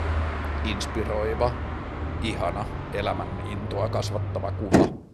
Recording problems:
traffic noise; very loud; throughout; 1 dB above the speech

